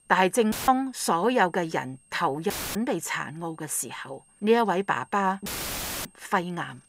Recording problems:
high-pitched whine; faint; throughout; 8.5 kHz, 30 dB below the speech
audio cutting out; filled with static; at 0.5 s, at 2.5 s and at 5.5 s for 0.5 s

